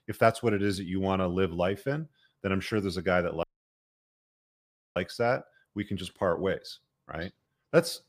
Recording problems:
audio cutting out; at 3.5 s for 1.5 s

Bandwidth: 15 kHz